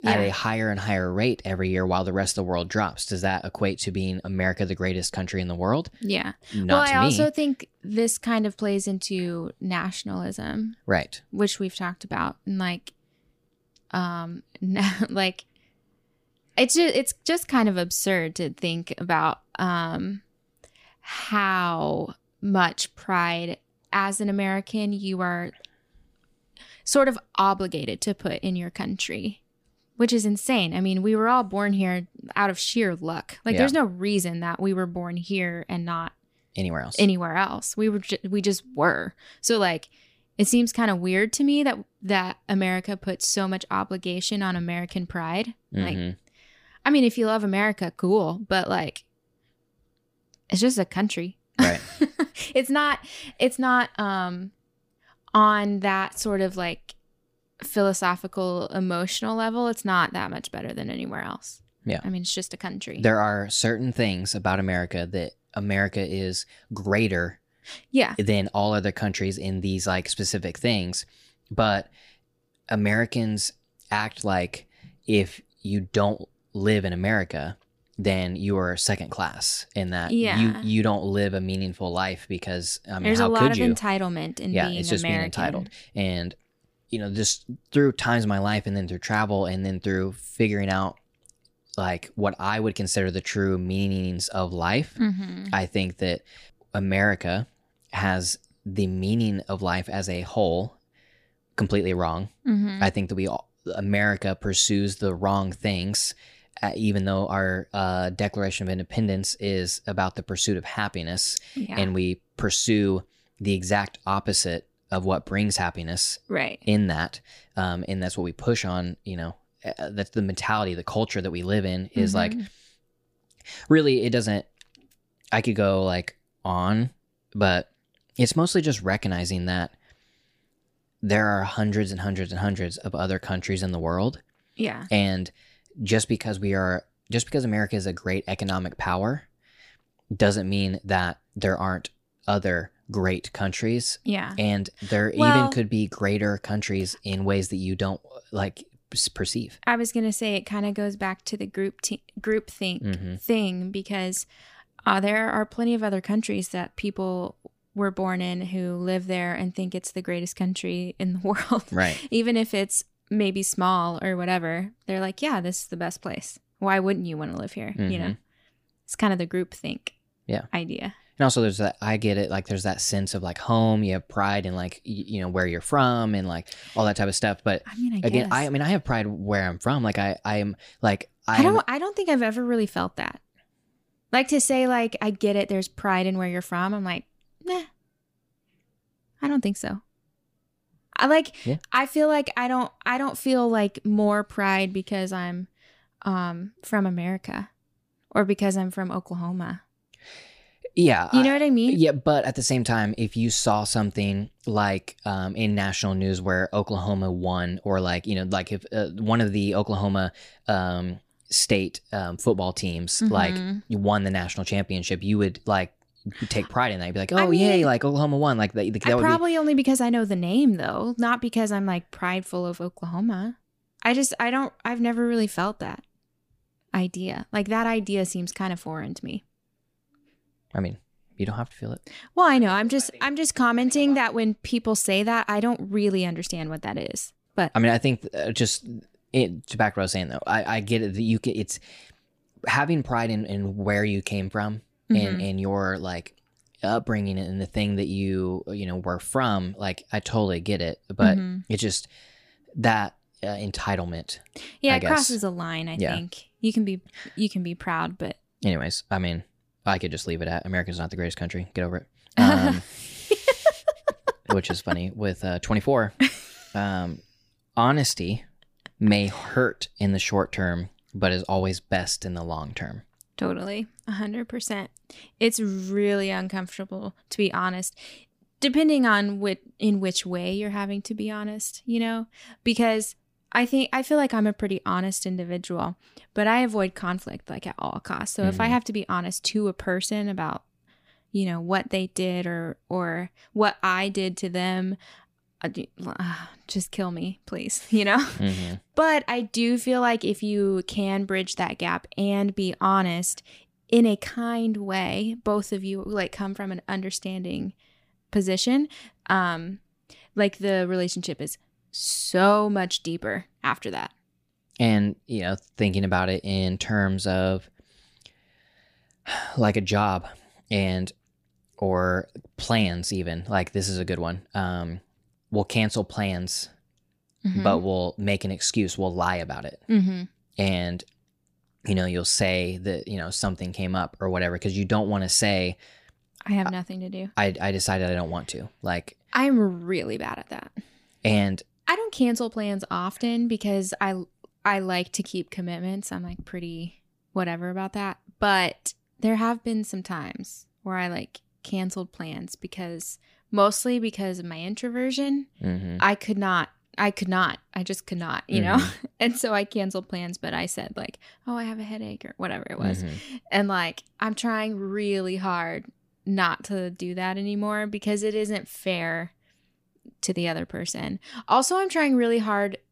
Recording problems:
none

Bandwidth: 15 kHz